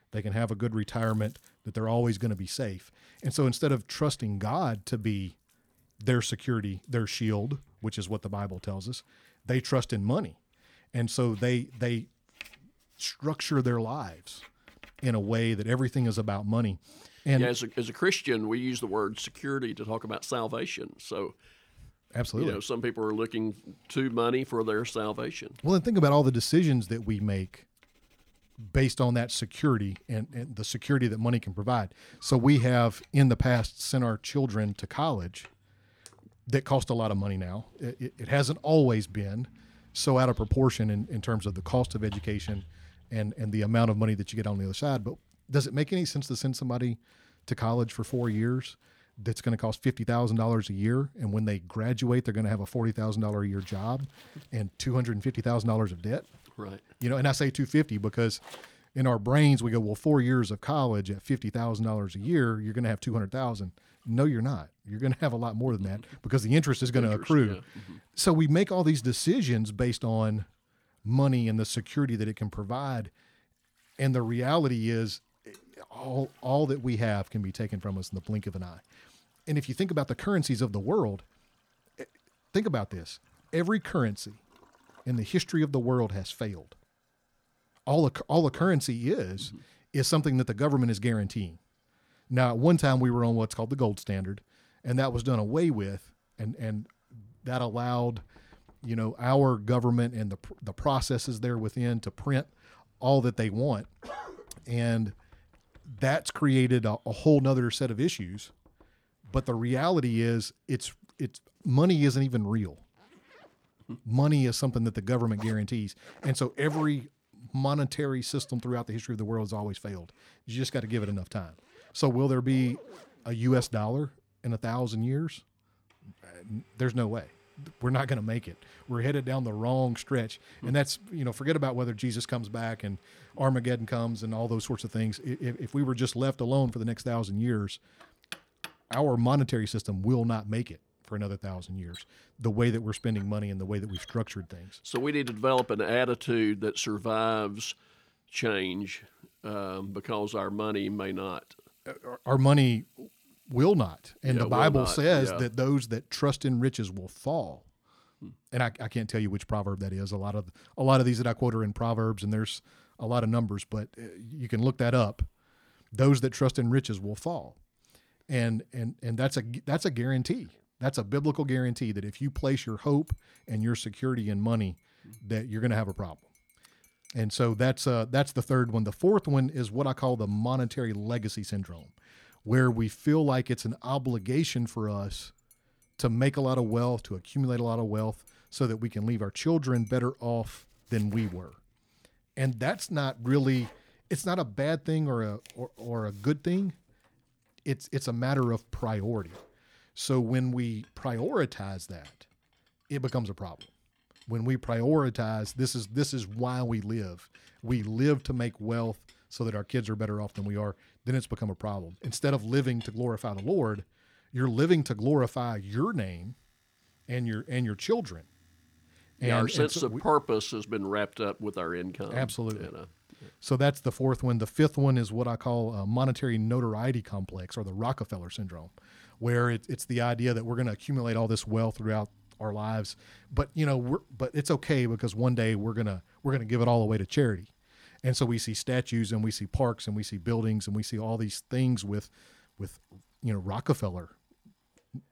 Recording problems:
household noises; faint; throughout; 25 dB below the speech

